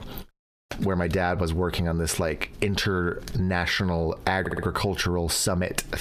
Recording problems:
squashed, flat; heavily
audio stuttering; at 4.5 s

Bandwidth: 14.5 kHz